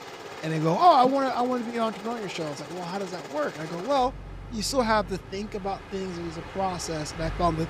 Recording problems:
train or aircraft noise; noticeable; throughout; 15 dB below the speech

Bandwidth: 14.5 kHz